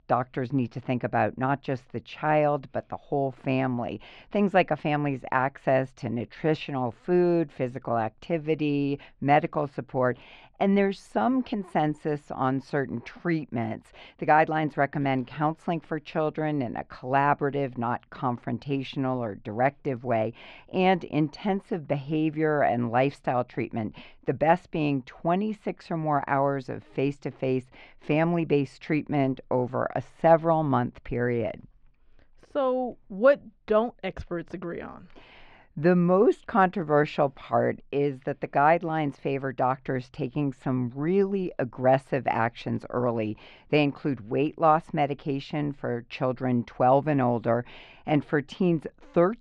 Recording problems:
muffled; slightly; fading above 3.5 kHz

